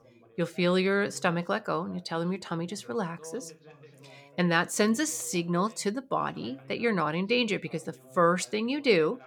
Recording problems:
background chatter; faint; throughout; 2 voices, 25 dB below the speech

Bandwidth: 18.5 kHz